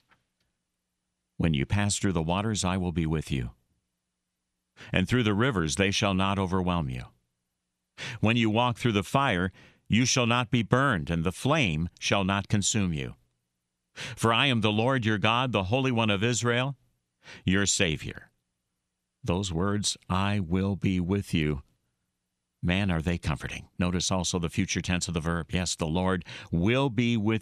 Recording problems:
none

